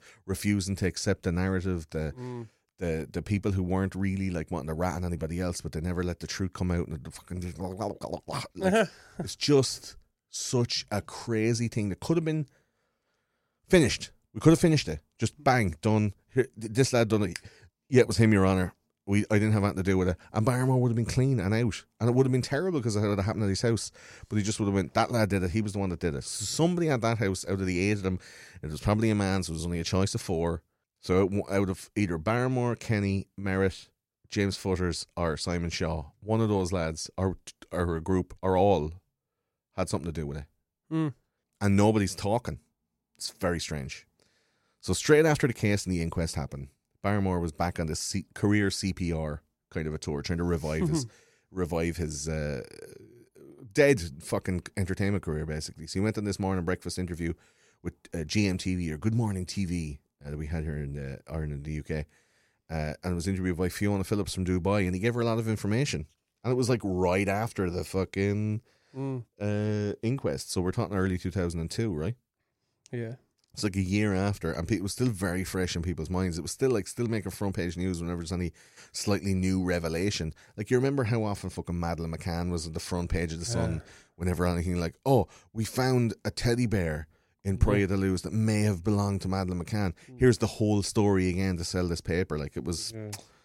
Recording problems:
none

